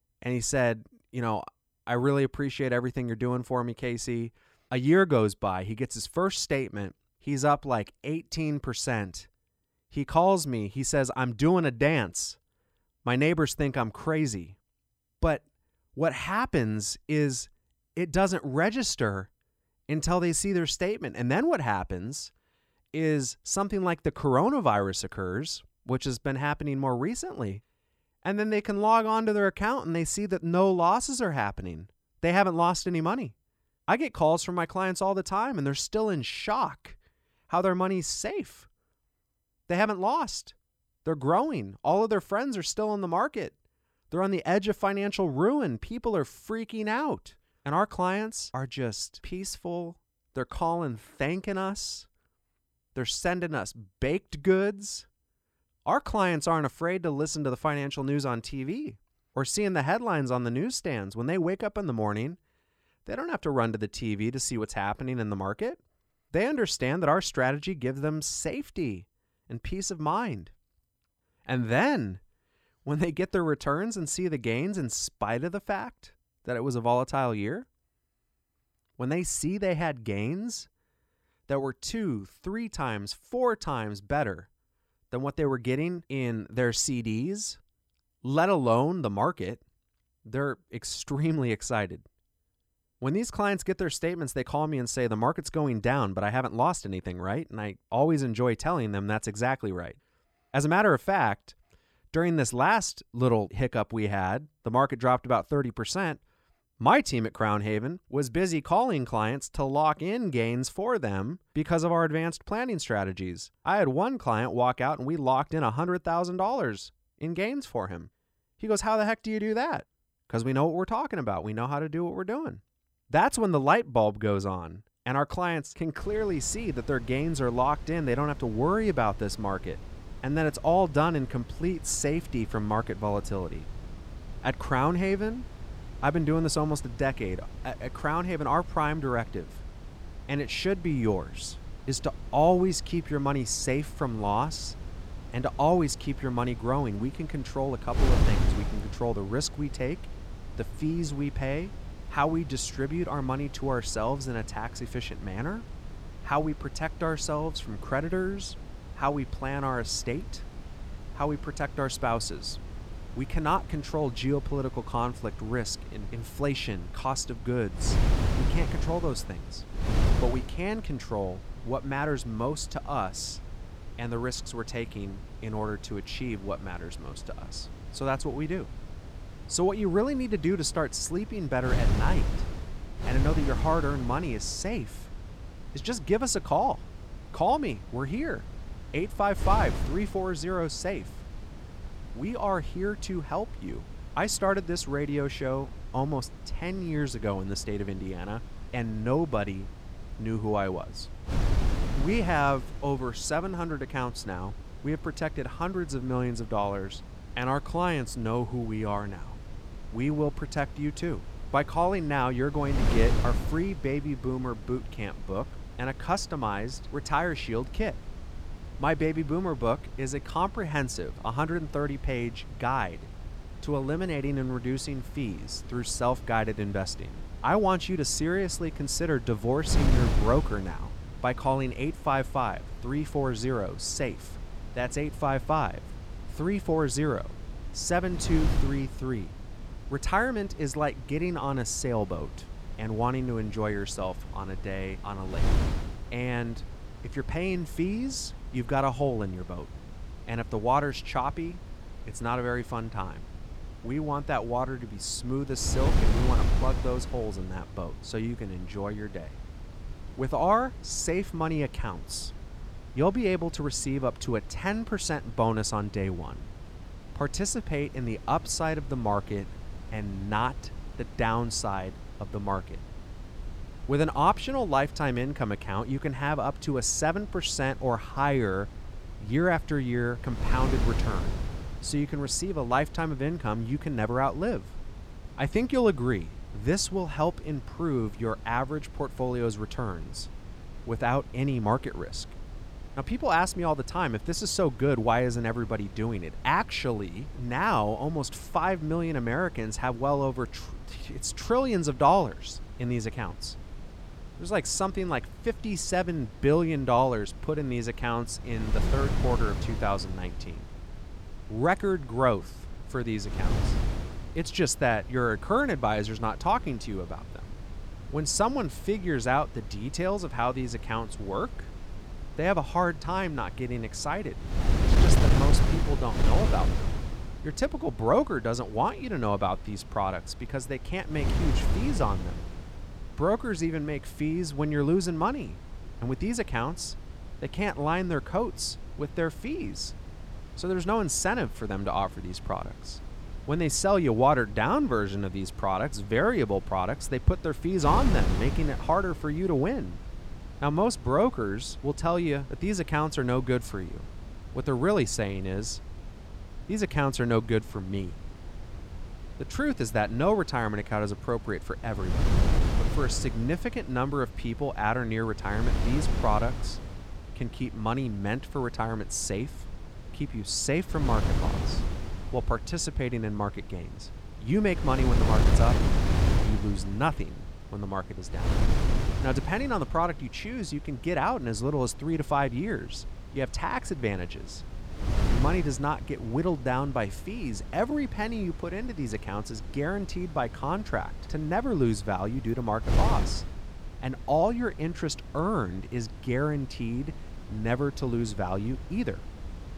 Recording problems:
wind noise on the microphone; occasional gusts; from 2:06 on; 15 dB below the speech

